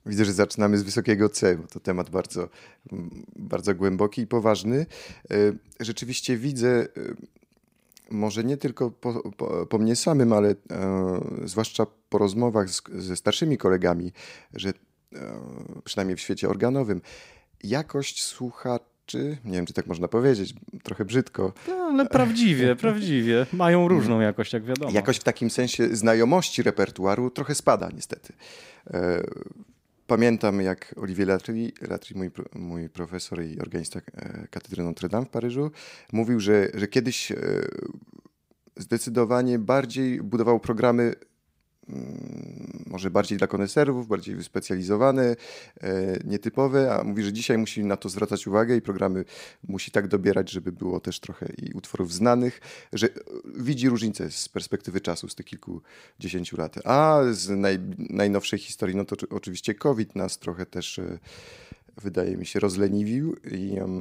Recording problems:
abrupt cut into speech; at the end

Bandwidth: 15.5 kHz